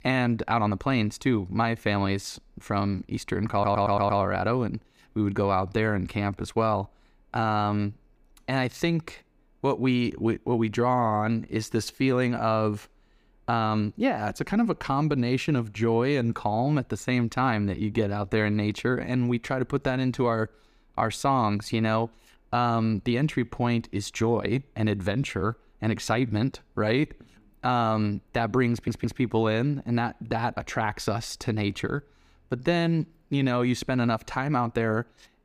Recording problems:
audio stuttering; at 3.5 s and at 29 s

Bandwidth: 15 kHz